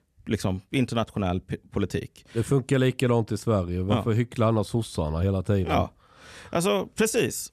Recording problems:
none

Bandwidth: 13.5 kHz